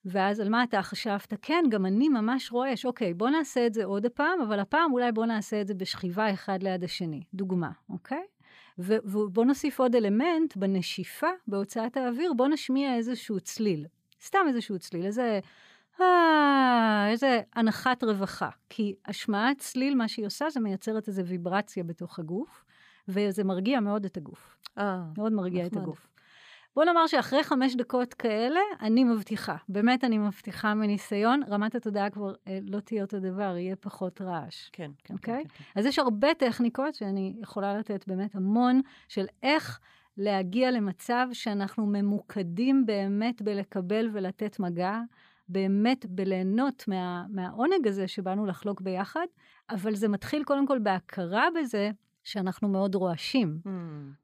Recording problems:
uneven, jittery; strongly; from 13 to 42 s

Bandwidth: 15 kHz